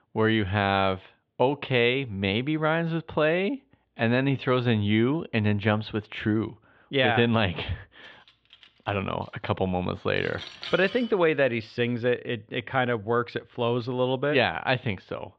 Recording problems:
muffled; very; fading above 3.5 kHz
clattering dishes; faint; from 8 to 11 s; peak 10 dB below the speech

